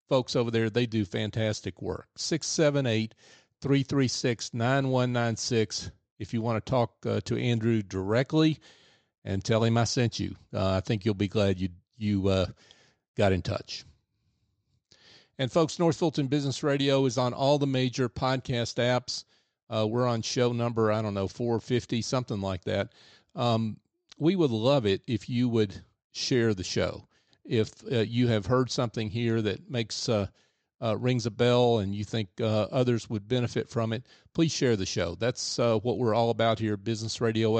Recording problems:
high frequencies cut off; noticeable; nothing above 8 kHz
abrupt cut into speech; at the end

